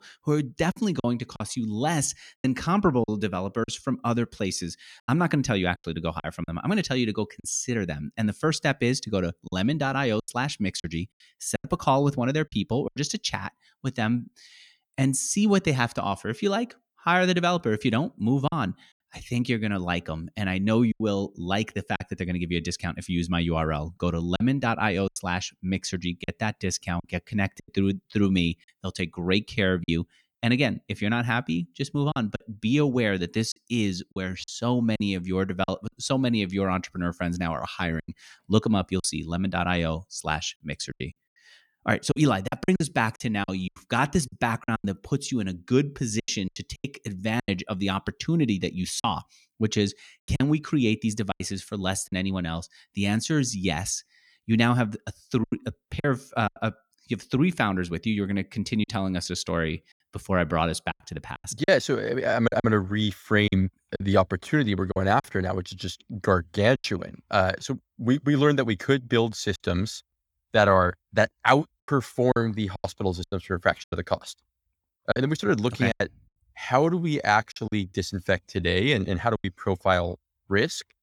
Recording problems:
choppy; very; 6% of the speech affected

